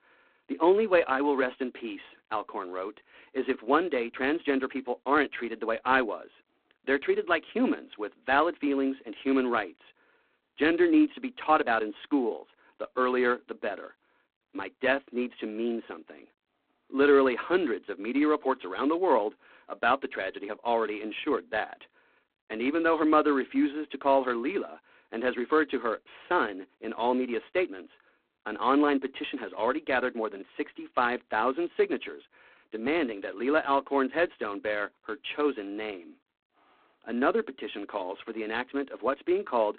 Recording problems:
phone-call audio; poor line; nothing above 4 kHz

